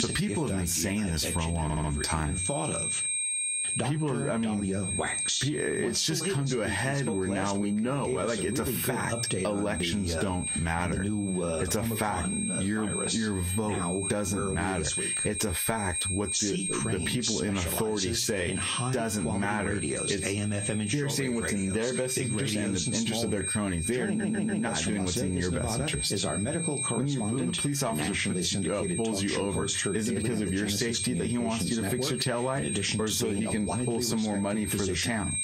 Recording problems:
squashed, flat; heavily, background pumping
garbled, watery; slightly; nothing above 15 kHz
high-pitched whine; loud; throughout; 8.5 kHz, 4 dB below the speech
voice in the background; loud; throughout; 2 dB below the speech
audio stuttering; at 1.5 s and at 24 s

